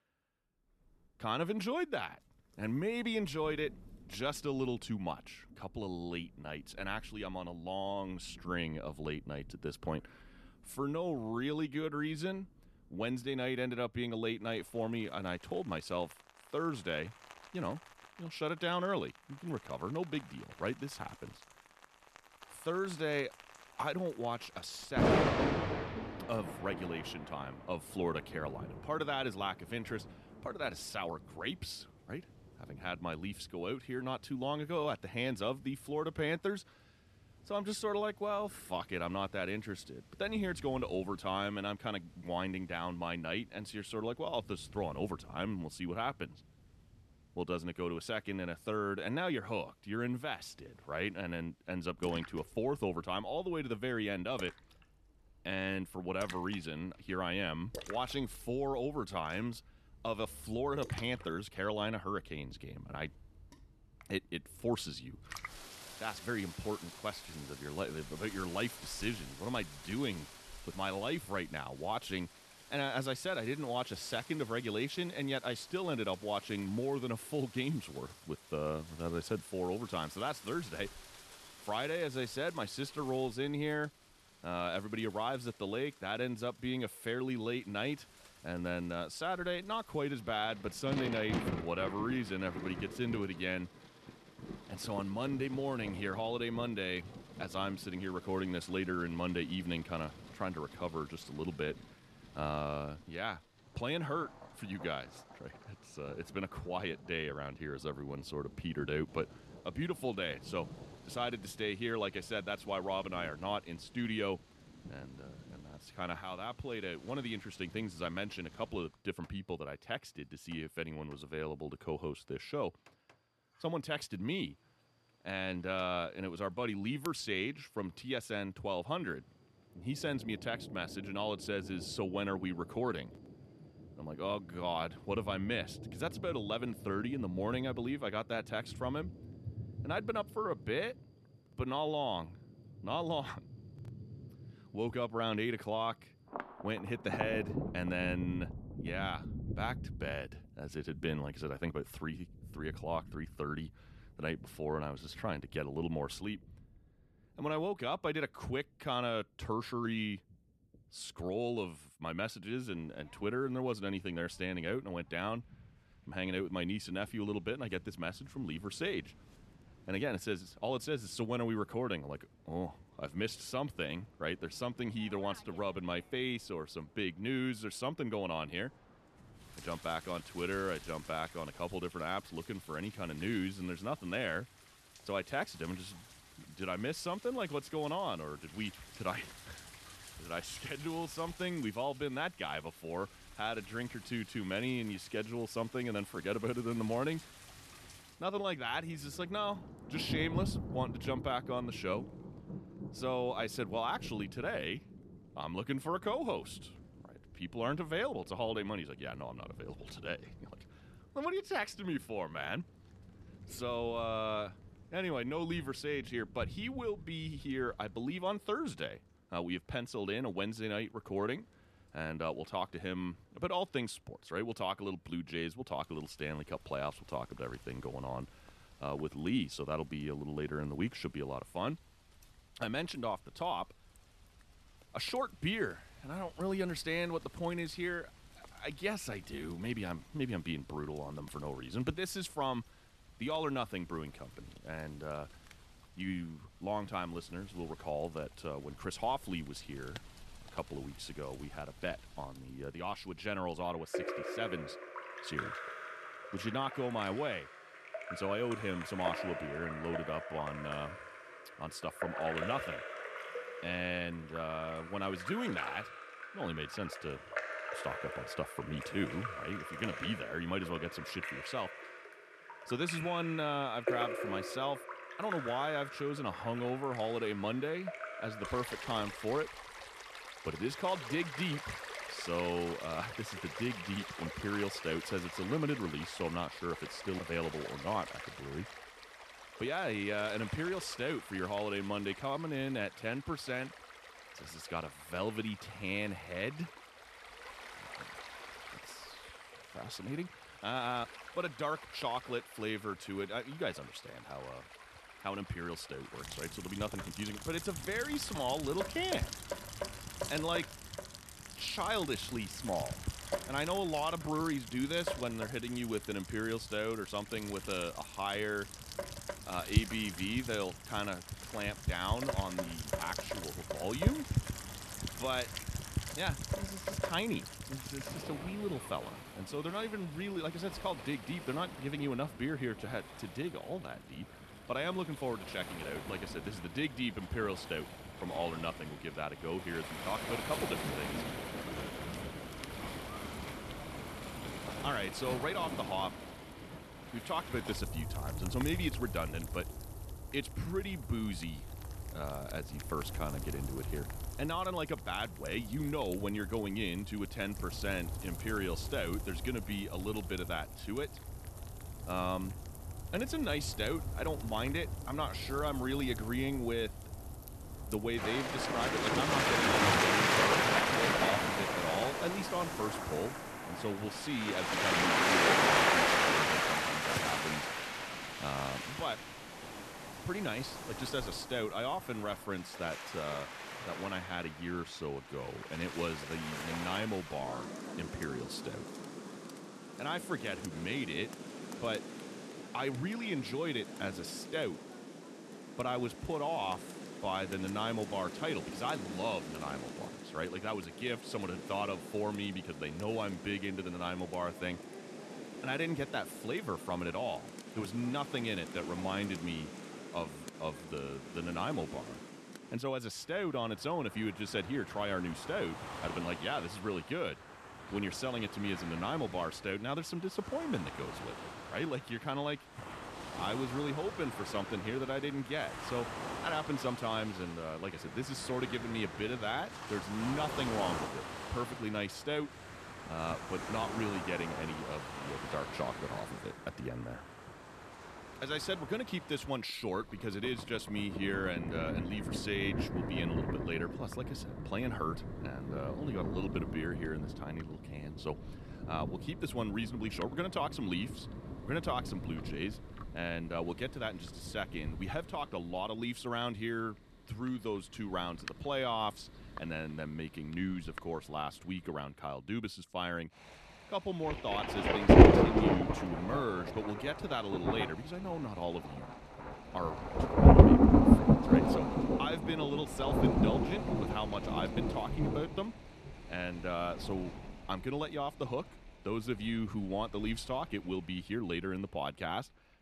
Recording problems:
rain or running water; very loud; throughout; 1 dB above the speech

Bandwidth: 13.5 kHz